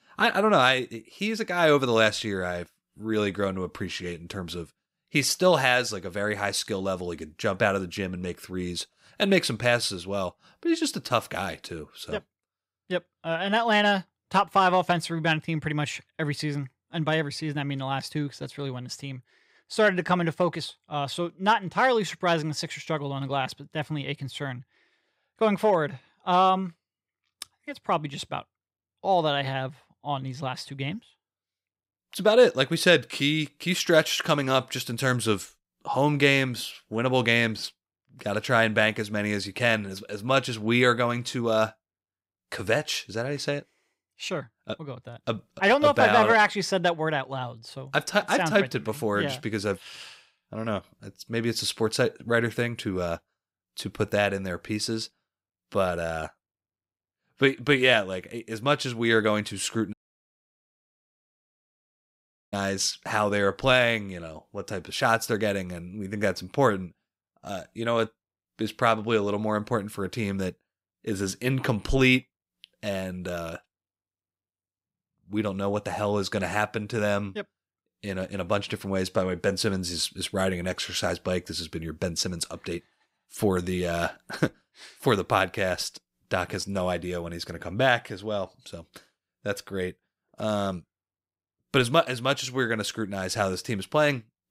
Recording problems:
audio cutting out; at 1:00 for 2.5 s

